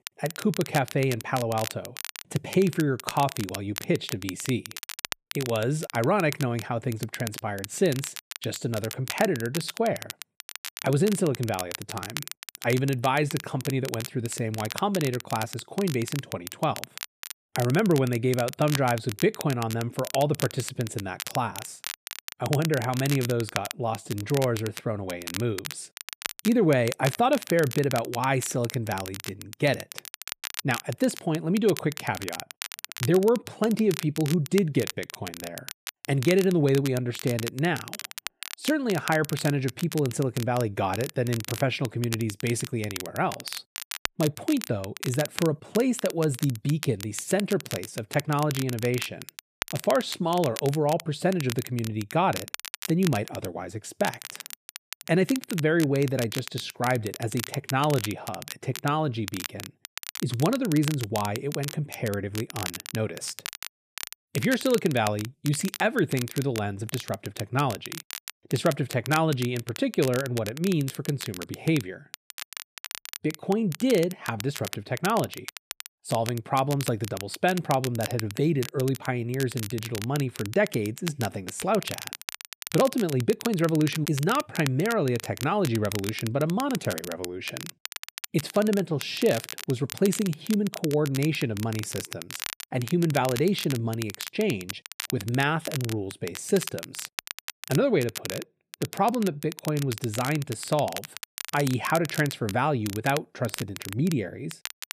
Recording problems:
crackle, like an old record; noticeable; 10 dB below the speech

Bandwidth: 14.5 kHz